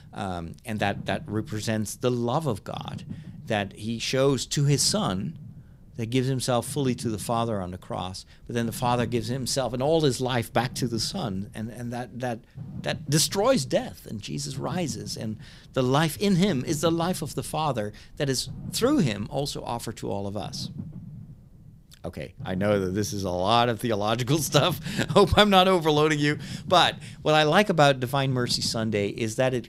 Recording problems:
low rumble; faint; throughout; 25 dB below the speech

